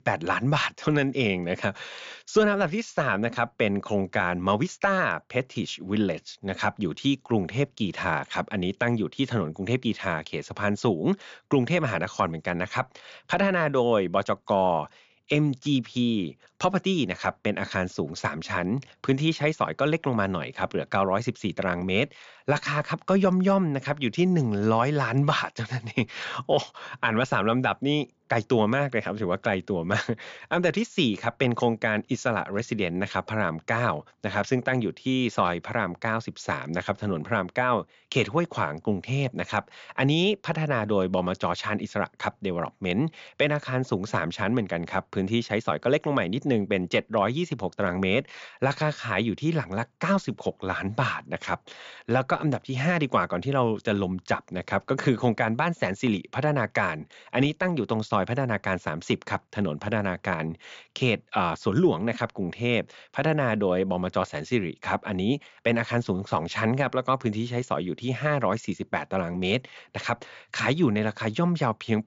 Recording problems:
high frequencies cut off; noticeable; nothing above 7.5 kHz

